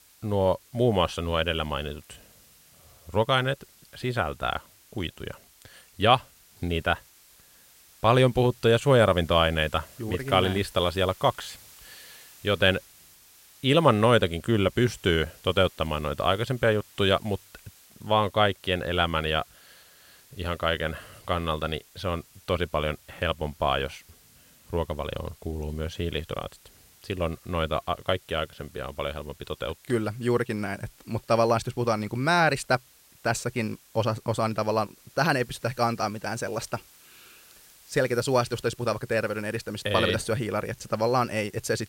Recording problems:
hiss; faint; throughout; 25 dB below the speech

